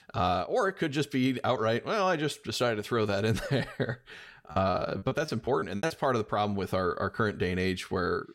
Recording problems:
choppy; very; from 4.5 to 6 s; 25% of the speech affected

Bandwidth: 16 kHz